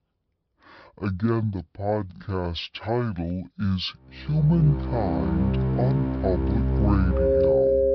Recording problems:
wrong speed and pitch; too slow and too low; 0.6 times normal speed
high frequencies cut off; noticeable; nothing above 5.5 kHz
background music; very loud; from 4.5 s on; 2 dB above the speech

